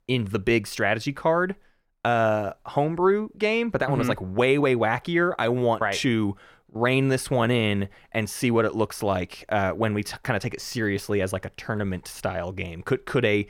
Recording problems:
none

